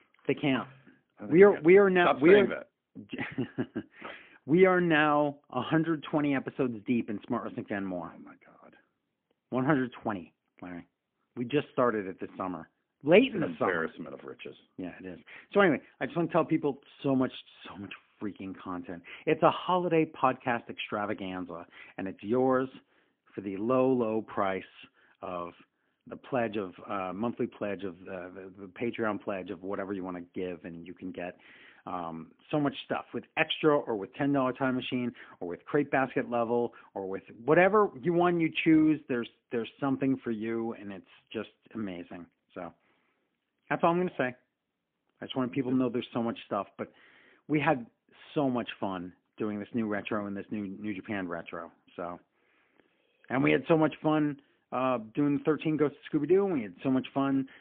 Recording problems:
phone-call audio; poor line; nothing above 3.5 kHz

